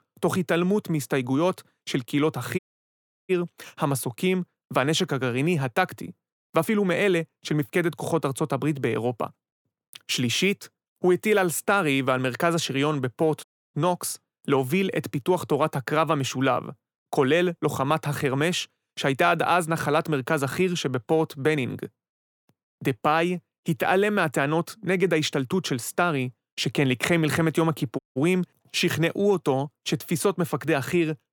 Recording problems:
audio cutting out; at 2.5 s for 0.5 s, at 13 s and at 28 s

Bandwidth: 18.5 kHz